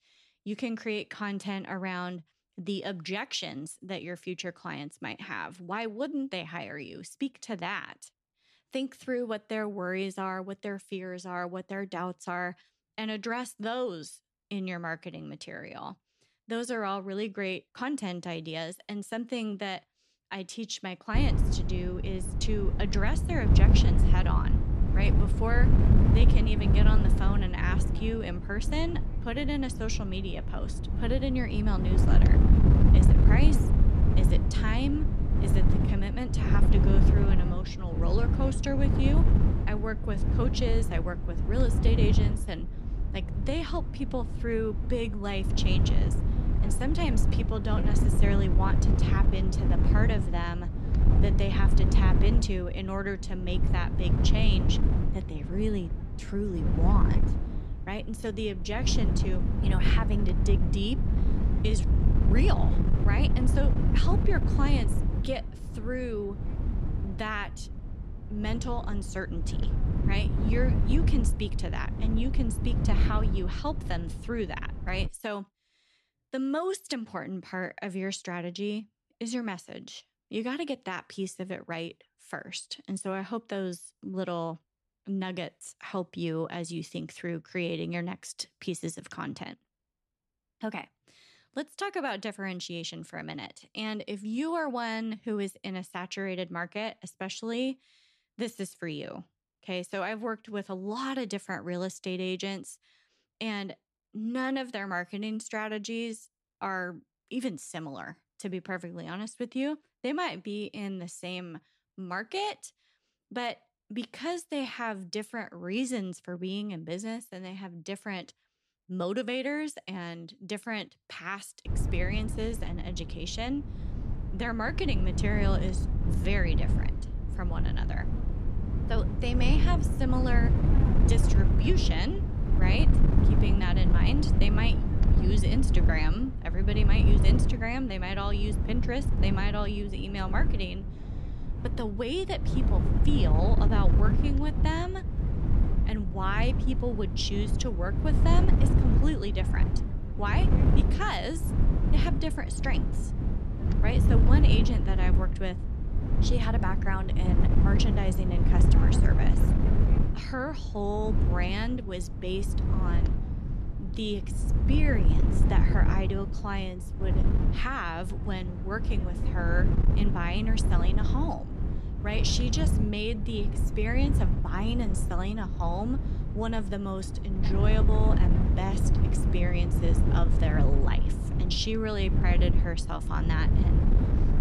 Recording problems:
wind noise on the microphone; heavy; from 21 s to 1:15 and from 2:02 on; 4 dB below the speech

